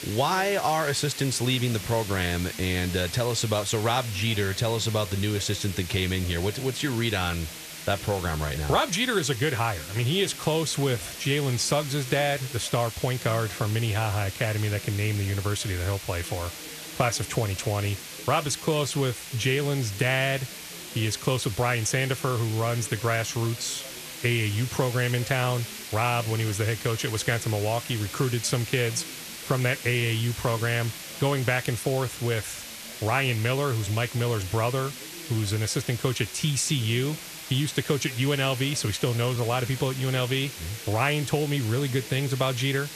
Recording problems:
hiss; noticeable; throughout; 10 dB below the speech
background chatter; faint; throughout; 2 voices, 20 dB below the speech
uneven, jittery; slightly; from 19 to 39 s

